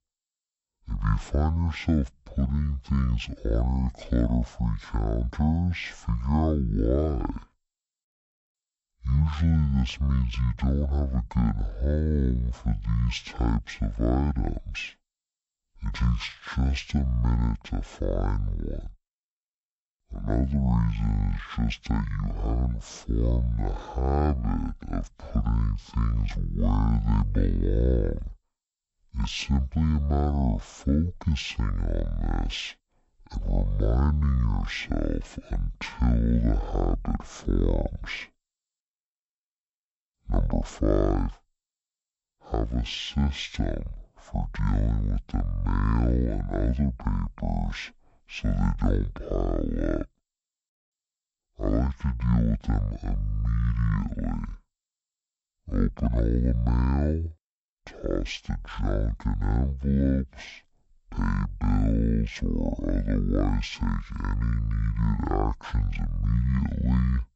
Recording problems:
wrong speed and pitch; too slow and too low; 0.5 times normal speed

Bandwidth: 8 kHz